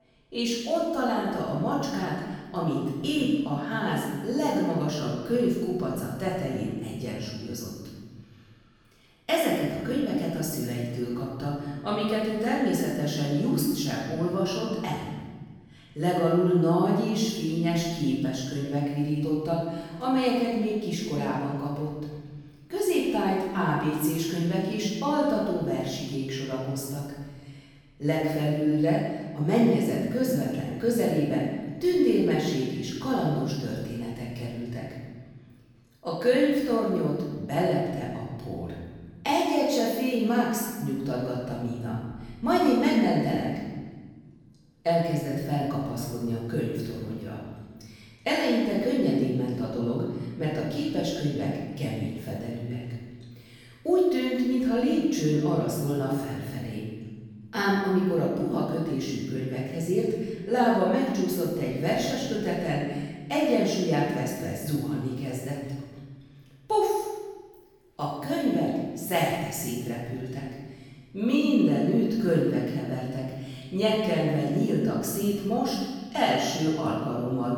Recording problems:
room echo; strong; dies away in 1.4 s
off-mic speech; far

